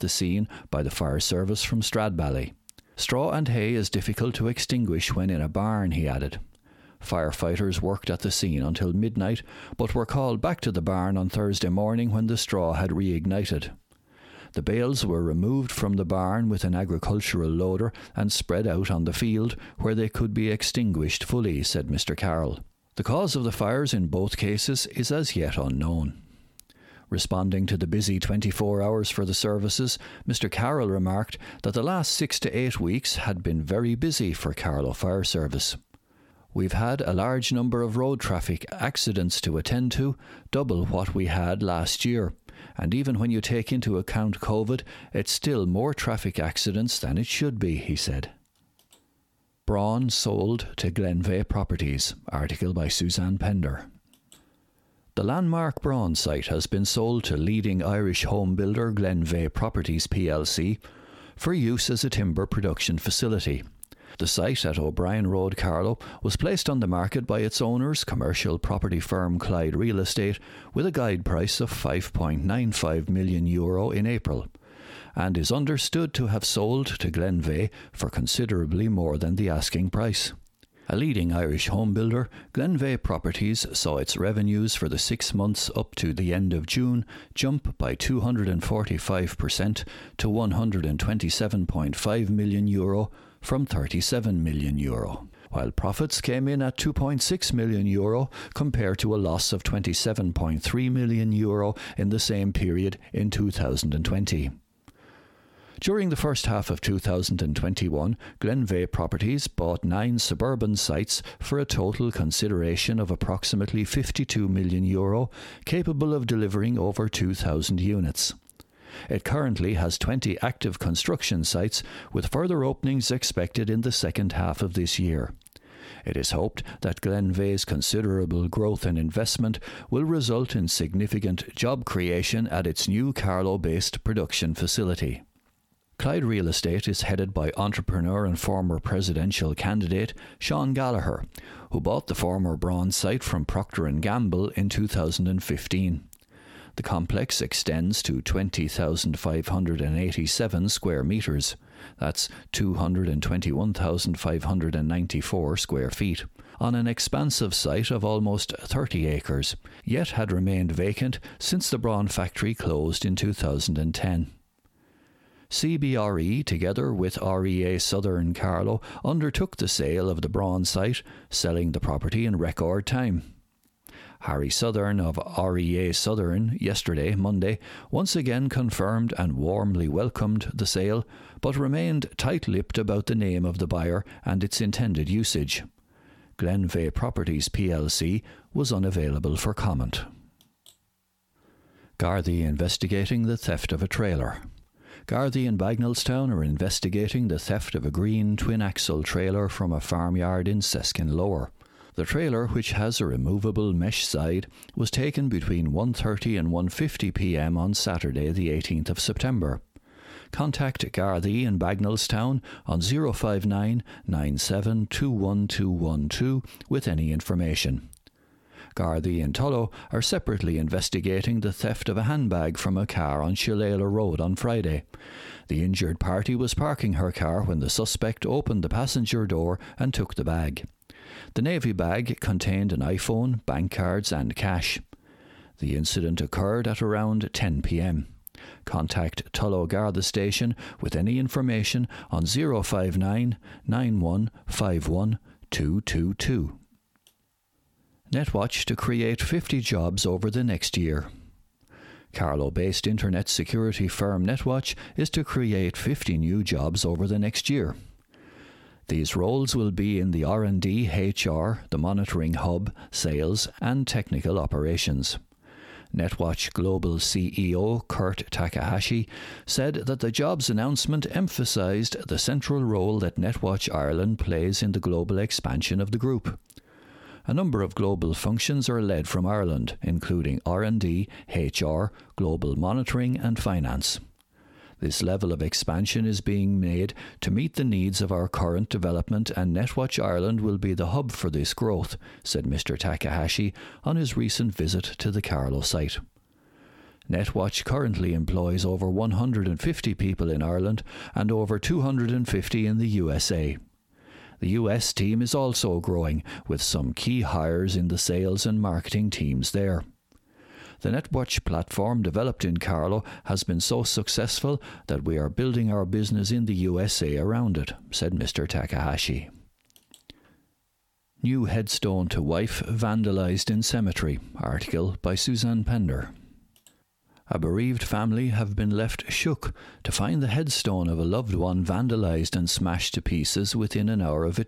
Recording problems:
squashed, flat; somewhat

